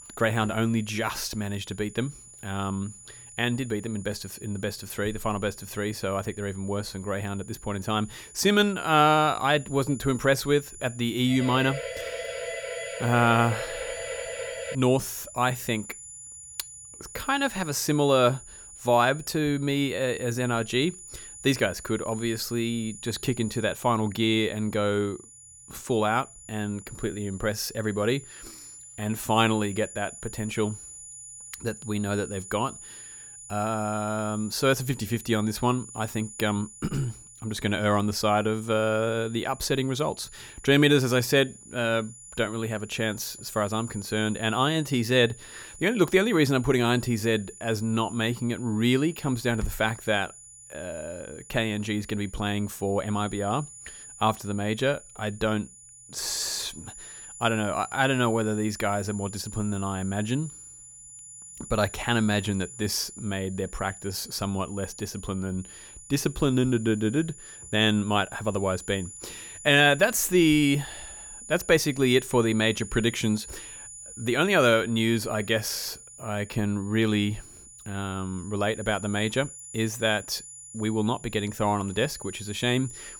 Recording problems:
high-pitched whine; noticeable; throughout; 7 kHz, 15 dB below the speech
siren; noticeable; from 11 to 15 s; peak 7 dB below the speech

